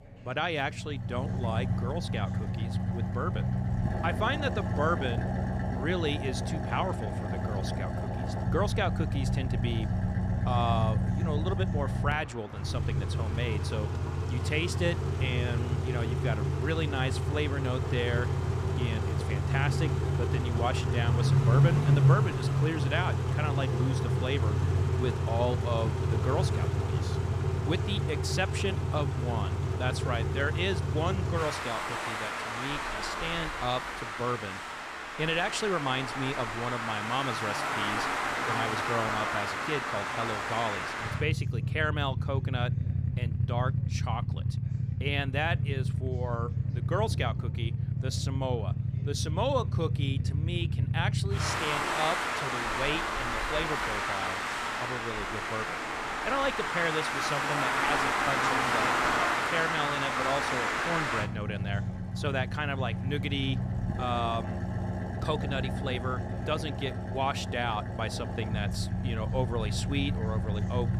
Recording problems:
traffic noise; very loud; throughout; 3 dB above the speech
background chatter; faint; throughout; 3 voices, 25 dB below the speech

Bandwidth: 14.5 kHz